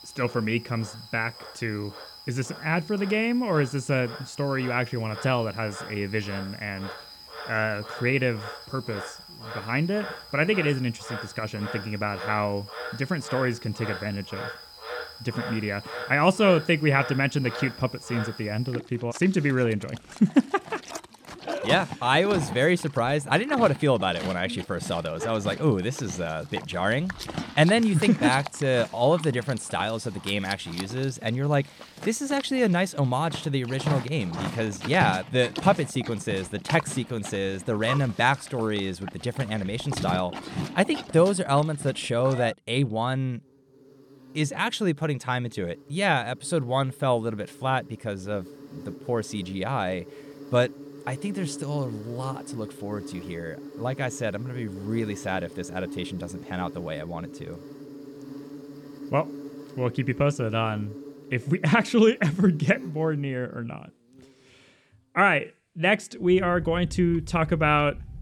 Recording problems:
animal sounds; noticeable; throughout; 15 dB below the speech

